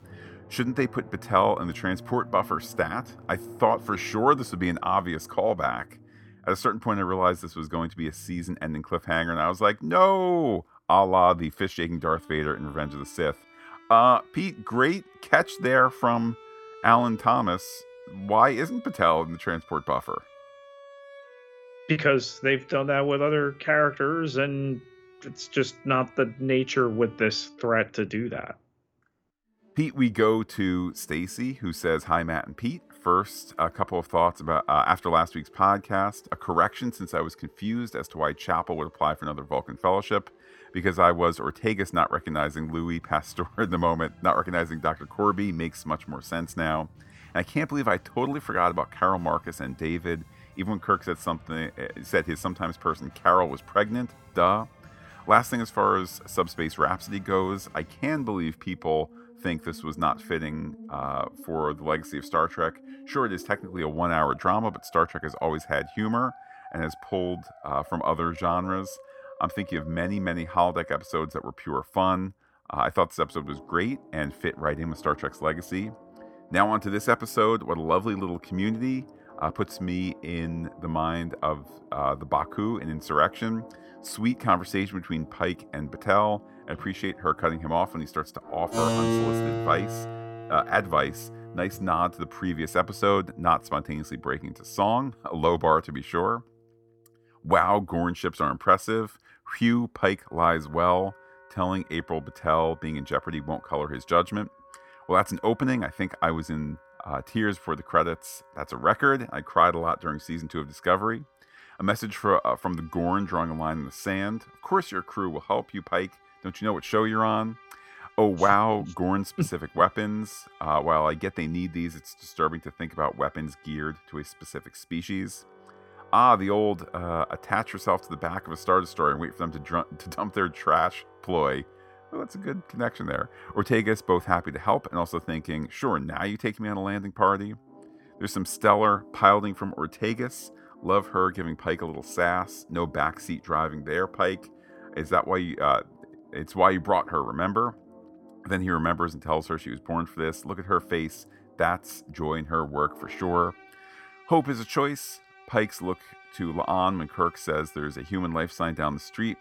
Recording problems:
background music; noticeable; throughout; 20 dB below the speech

